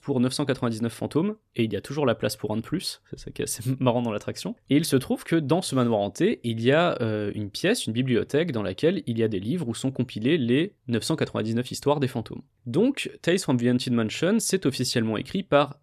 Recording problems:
none

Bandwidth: 14.5 kHz